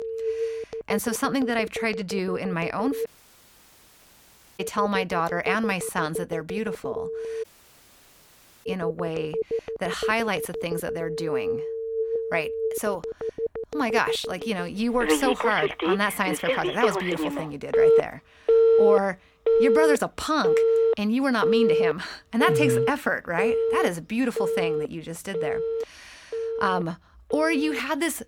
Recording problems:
alarms or sirens; very loud; throughout; 1 dB above the speech
audio cutting out; at 3 s for 1.5 s and at 7.5 s for 1 s

